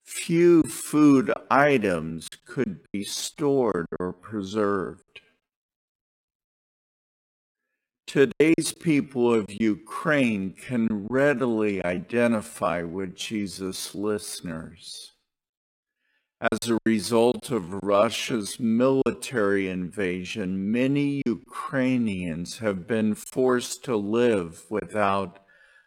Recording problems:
wrong speed, natural pitch; too slow; 0.6 times normal speed
choppy; occasionally; 5% of the speech affected

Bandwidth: 16.5 kHz